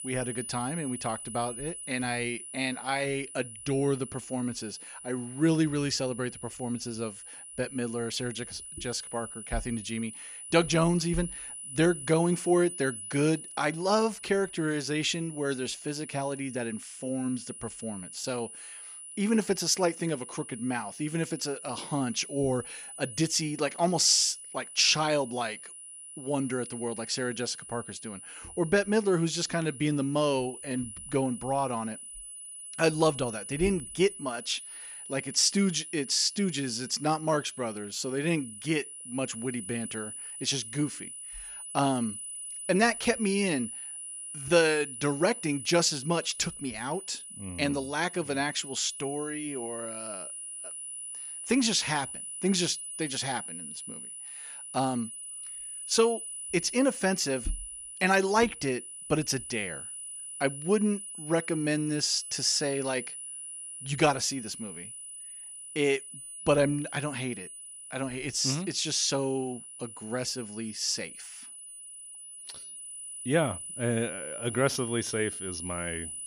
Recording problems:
high-pitched whine; noticeable; throughout; 10 kHz, 10 dB below the speech

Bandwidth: 15.5 kHz